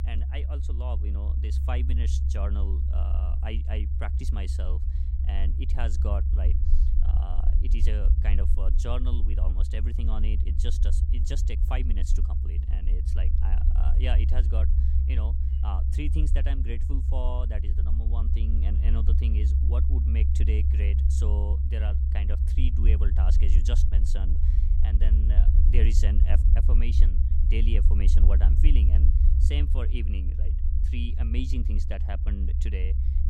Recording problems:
low rumble; loud; throughout; 3 dB below the speech

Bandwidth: 16 kHz